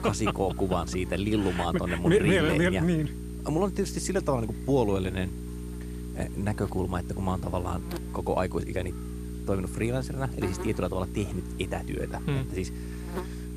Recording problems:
electrical hum; noticeable; throughout; 60 Hz, 15 dB below the speech

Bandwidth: 14.5 kHz